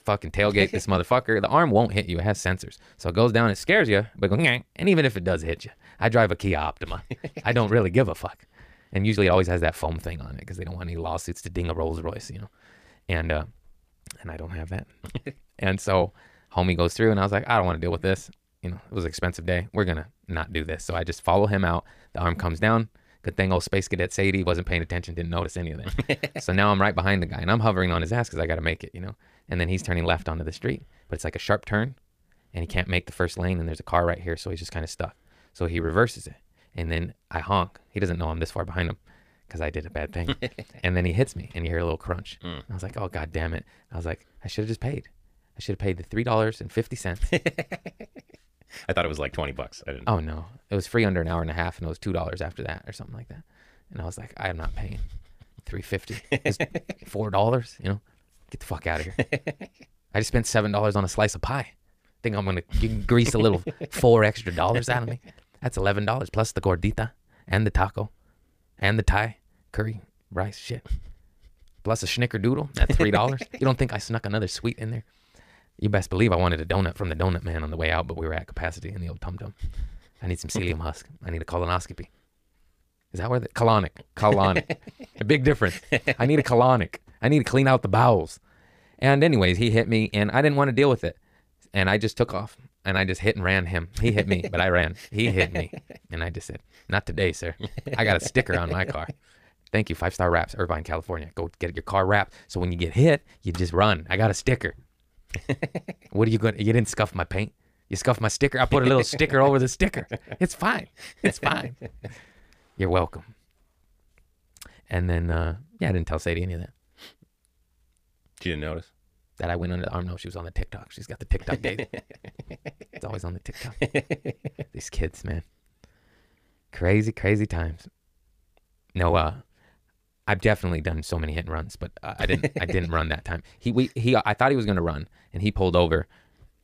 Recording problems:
wrong speed, natural pitch; too fast; 1.5 times normal speed

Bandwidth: 15 kHz